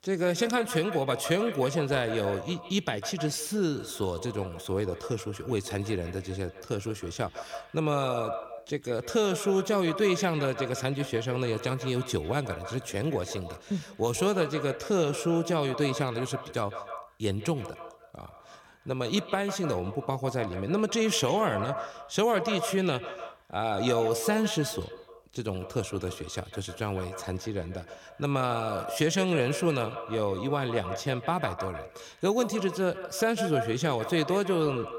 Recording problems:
echo of what is said; strong; throughout; 150 ms later, 9 dB below the speech

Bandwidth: 17 kHz